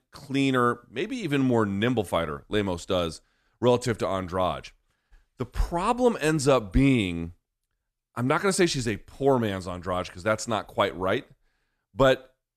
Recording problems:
none

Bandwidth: 14 kHz